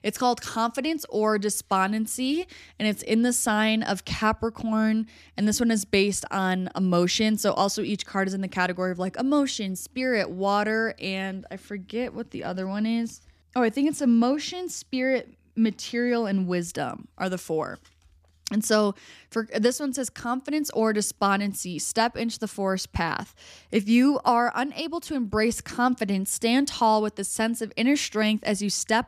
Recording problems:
none

